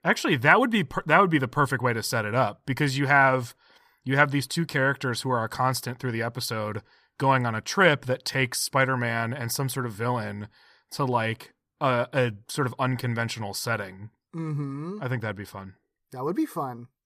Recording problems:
none

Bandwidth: 15 kHz